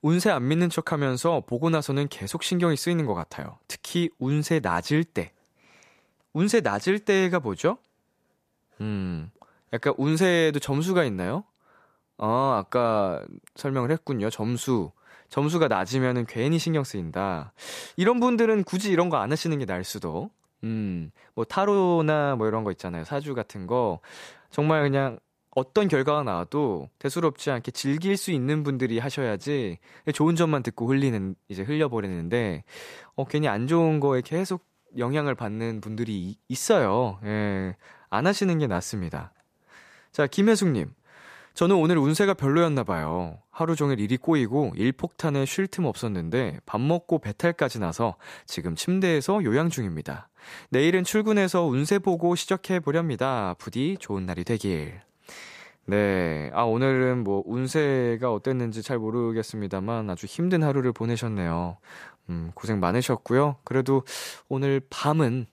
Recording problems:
none

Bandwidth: 14.5 kHz